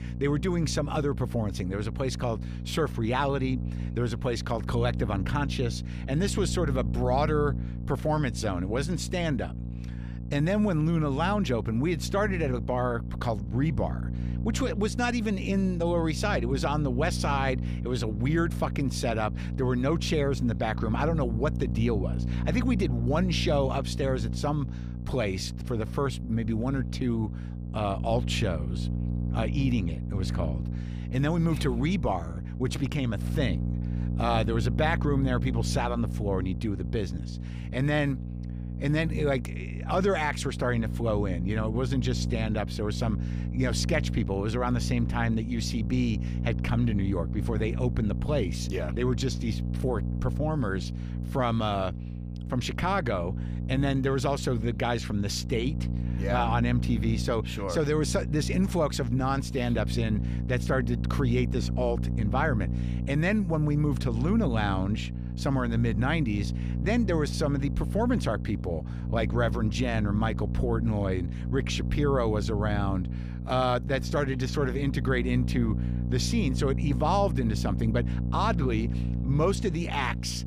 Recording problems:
electrical hum; noticeable; throughout; 60 Hz, 10 dB below the speech

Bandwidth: 15 kHz